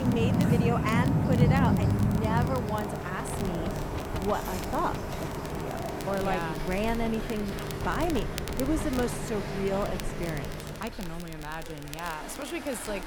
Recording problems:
rain or running water; very loud; throughout; 2 dB above the speech
traffic noise; loud; throughout; 5 dB below the speech
wind noise on the microphone; occasional gusts; 15 dB below the speech
crackle, like an old record; noticeable; 15 dB below the speech
abrupt cut into speech; at the start

